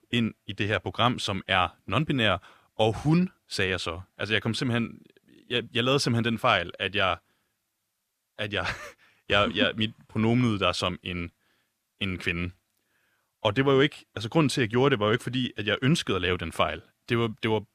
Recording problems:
none

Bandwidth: 14.5 kHz